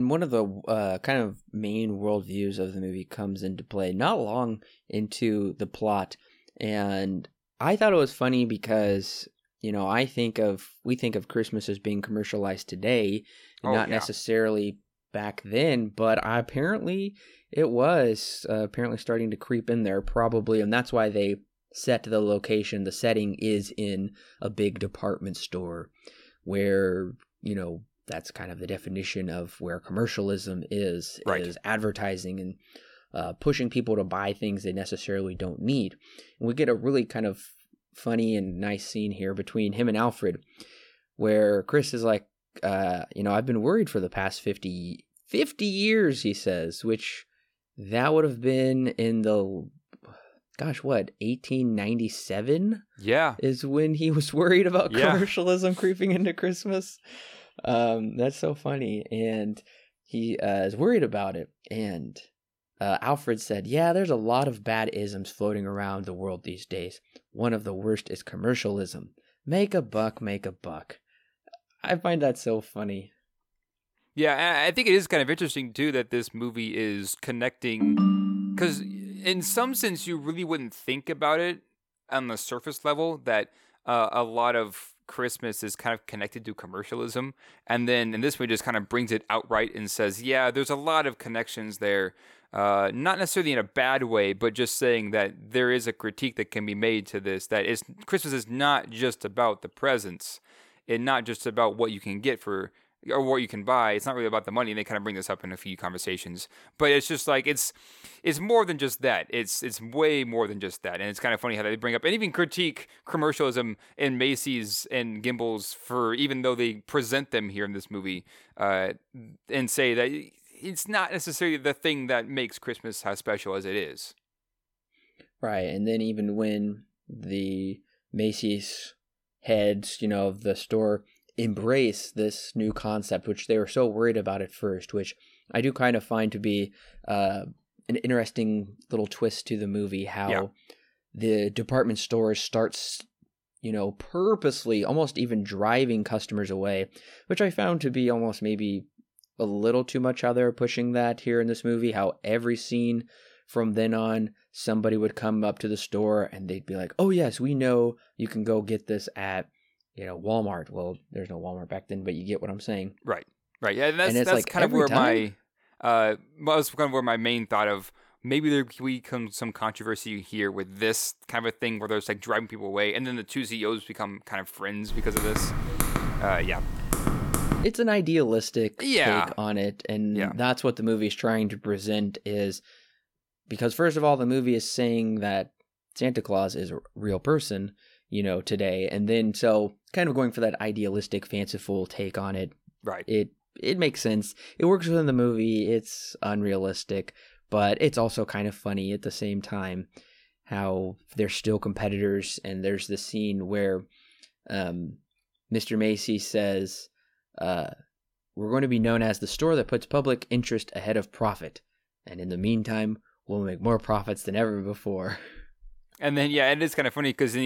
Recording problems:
abrupt cut into speech; at the start and the end
phone ringing; loud; from 1:18 to 1:19; peak 6 dB above the speech
keyboard typing; loud; from 2:55 to 2:58; peak level with the speech

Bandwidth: 17 kHz